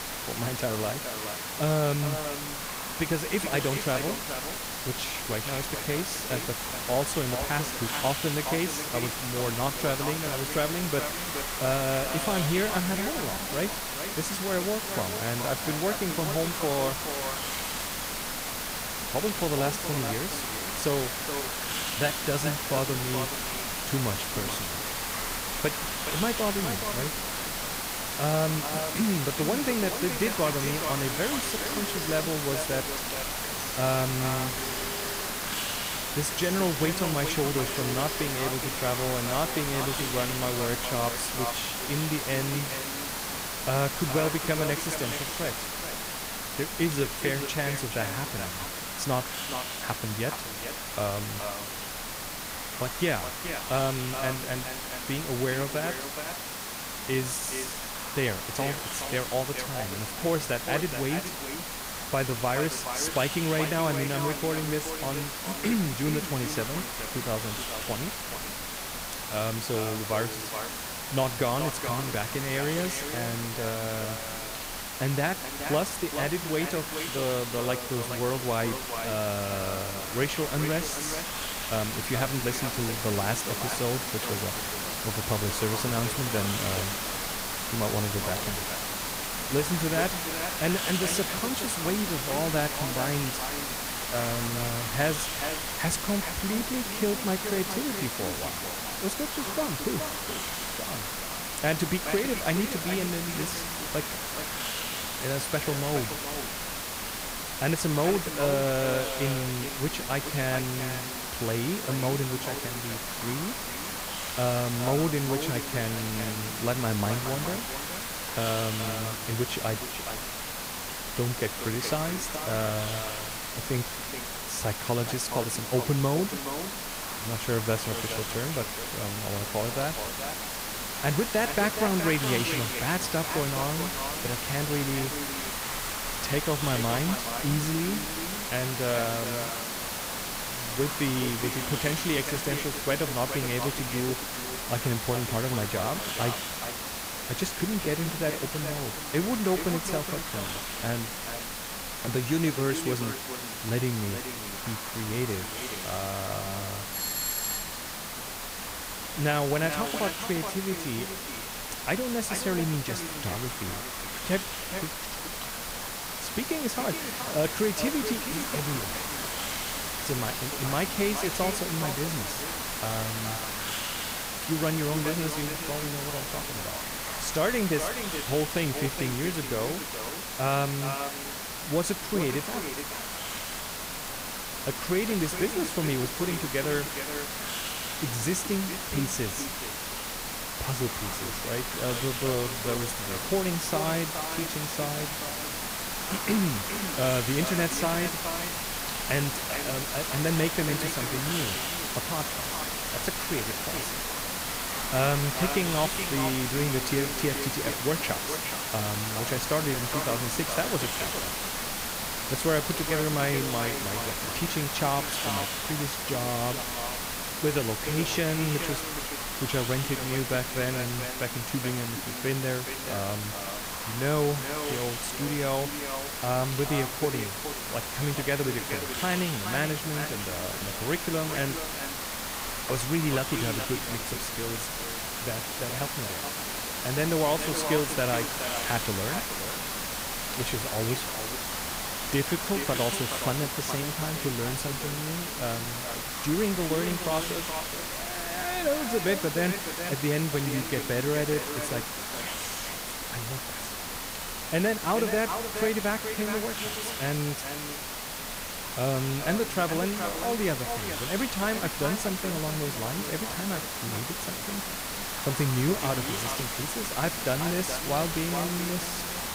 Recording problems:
echo of what is said; strong; throughout; 420 ms later, 9 dB below the speech
hiss; loud; throughout; 1 dB below the speech
phone ringing; noticeable; from 30 to 39 s; peak 7 dB below the speech
doorbell; loud; at 2:37; peak 3 dB above the speech

